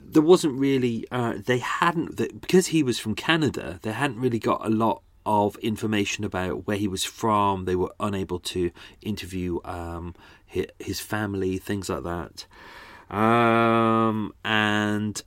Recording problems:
none

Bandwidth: 16 kHz